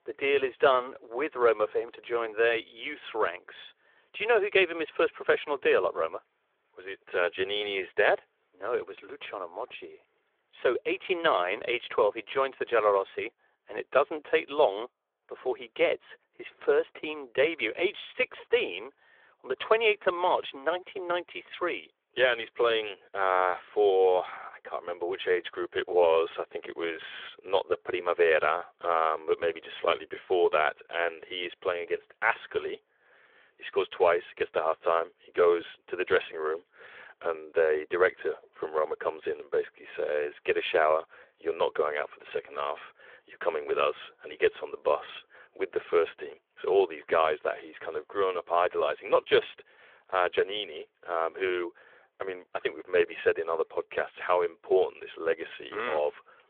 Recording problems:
phone-call audio; nothing above 3.5 kHz

